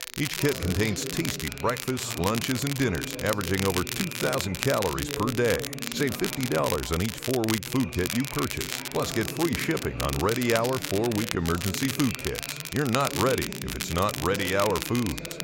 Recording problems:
crackle, like an old record; loud; 5 dB below the speech
chatter from many people; noticeable; throughout; 10 dB below the speech

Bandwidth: 16 kHz